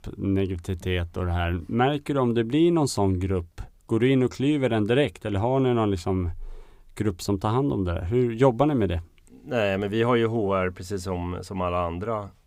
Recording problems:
none

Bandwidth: 15.5 kHz